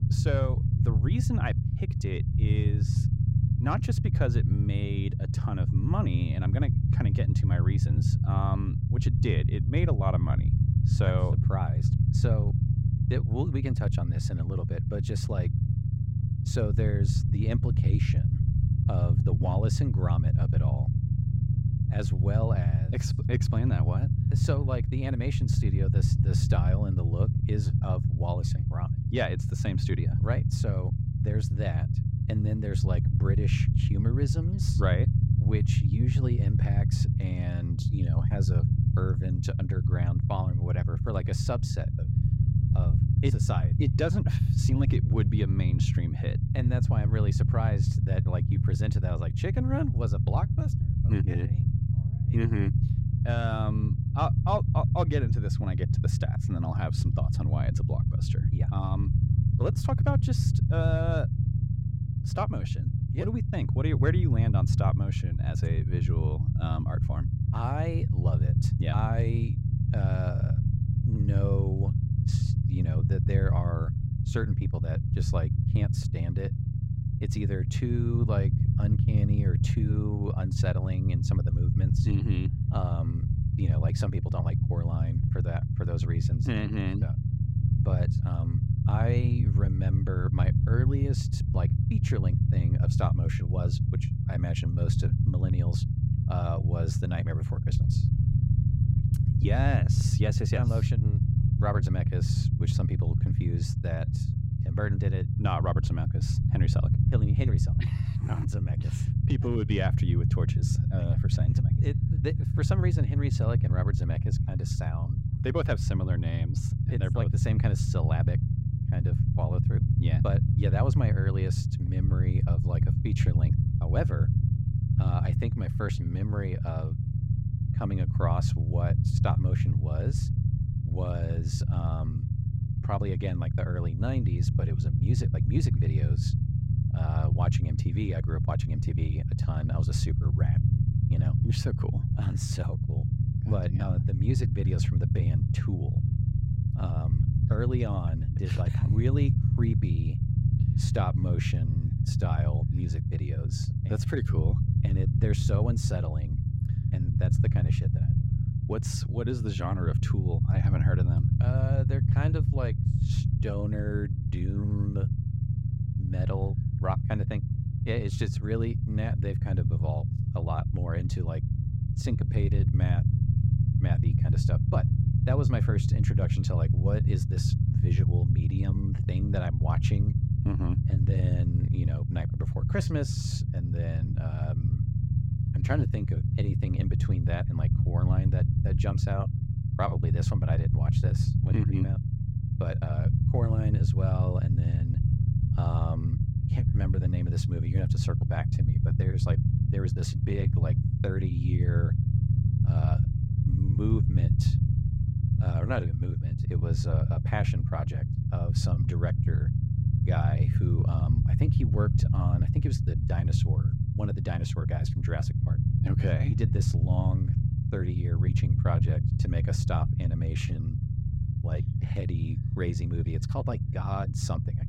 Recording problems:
low rumble; loud; throughout; 1 dB below the speech

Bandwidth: 16 kHz